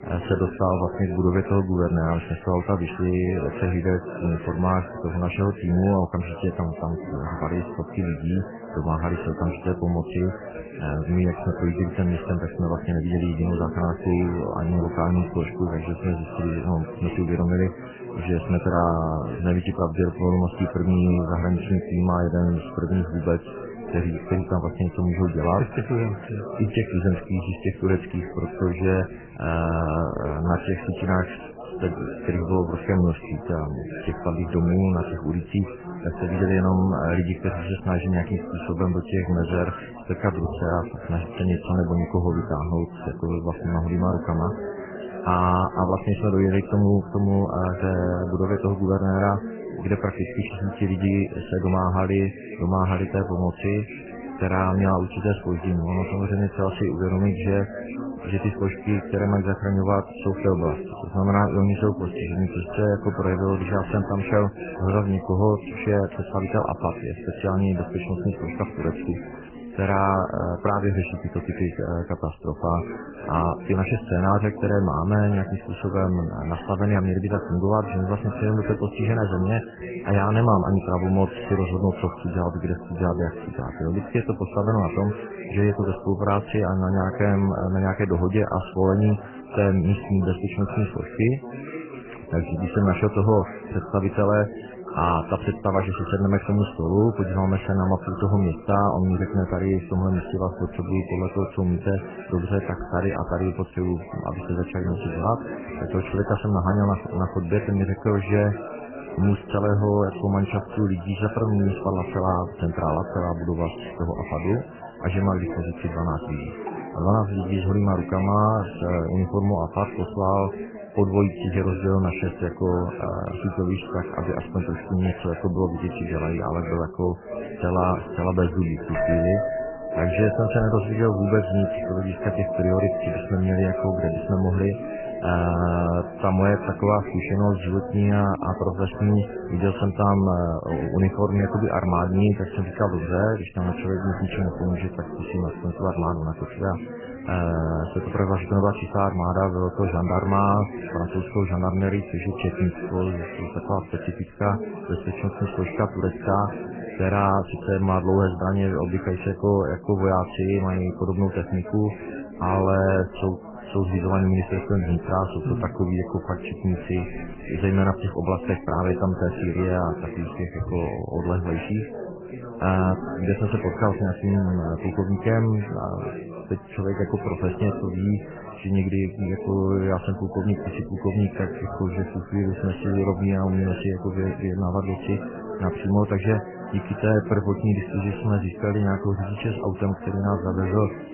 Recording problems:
garbled, watery; badly; nothing above 3 kHz
muffled; very slightly; fading above 2 kHz
household noises; noticeable; throughout; 15 dB below the speech
background chatter; noticeable; throughout; 4 voices, 10 dB below the speech

